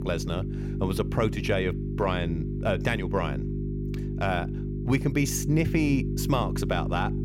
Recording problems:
electrical hum; loud; throughout; 50 Hz, 9 dB below the speech

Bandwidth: 16.5 kHz